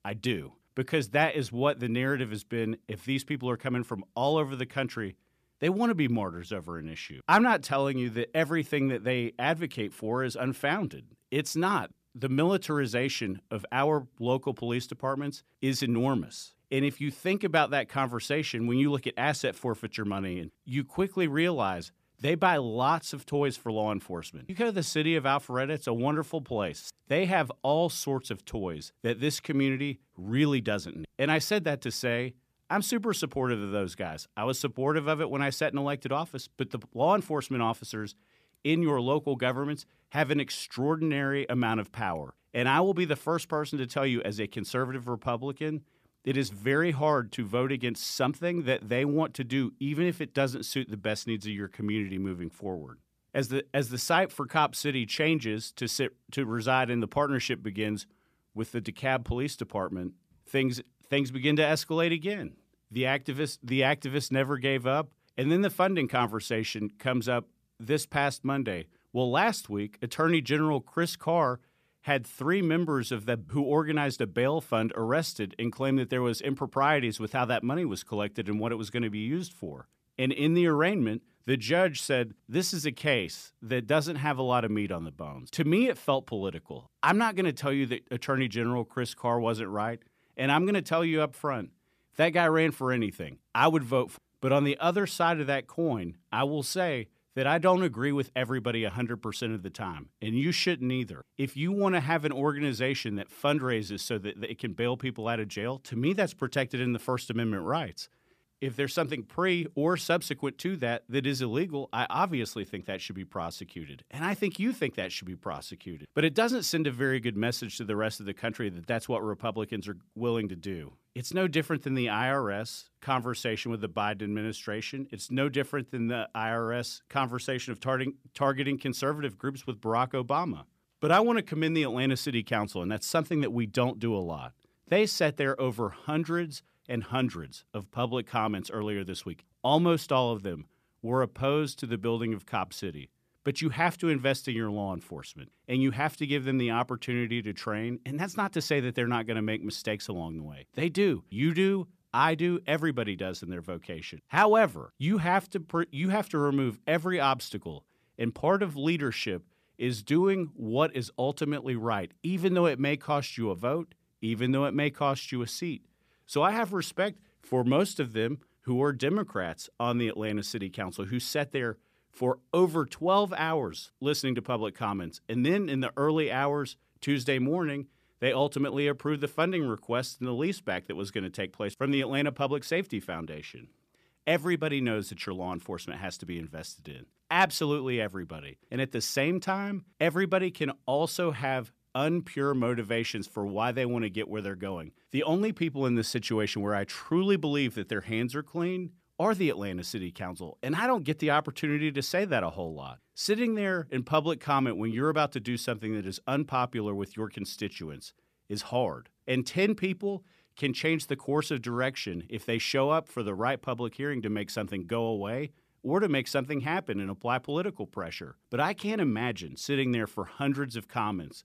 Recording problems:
none

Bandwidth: 14.5 kHz